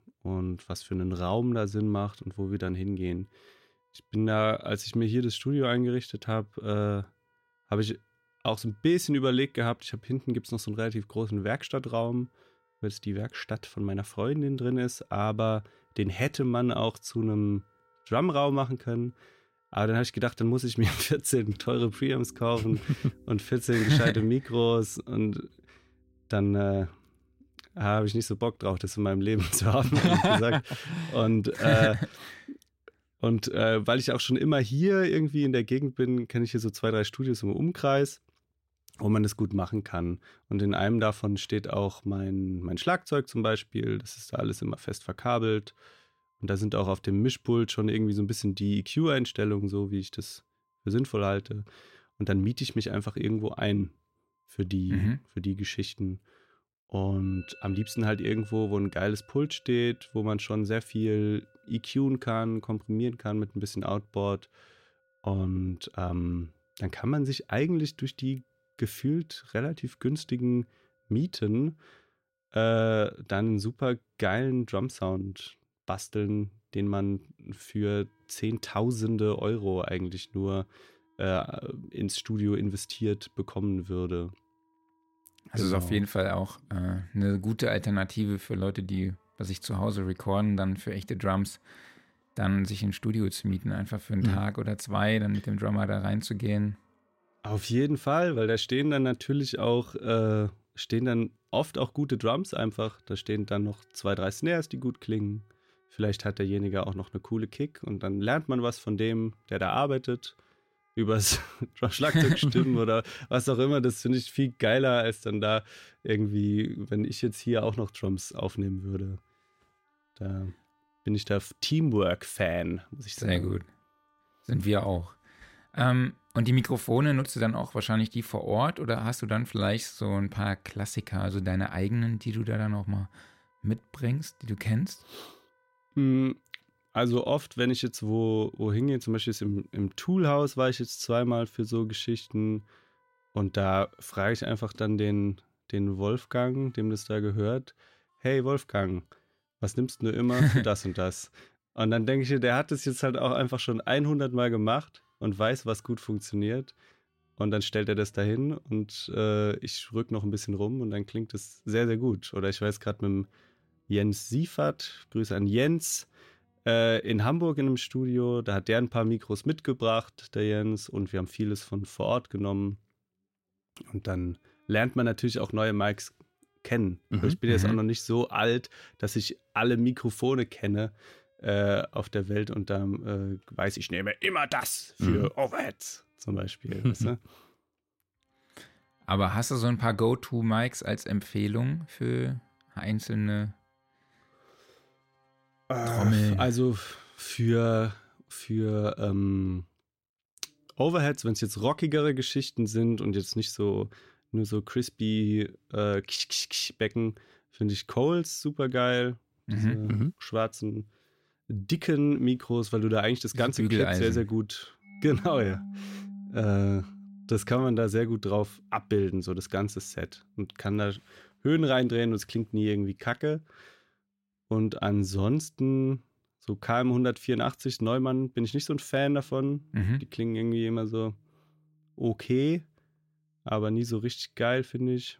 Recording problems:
background music; faint; throughout; 25 dB below the speech

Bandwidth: 16 kHz